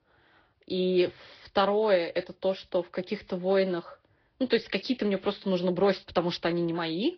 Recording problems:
garbled, watery; slightly; nothing above 5 kHz
high frequencies cut off; slight

